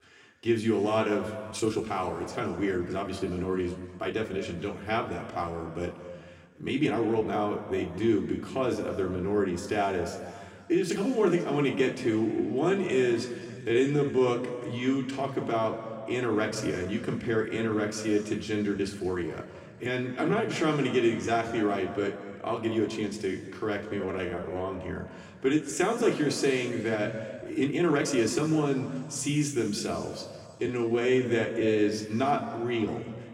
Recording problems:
room echo; slight; dies away in 2.1 s
off-mic speech; somewhat distant
uneven, jittery; strongly; from 1.5 to 31 s

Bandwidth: 16 kHz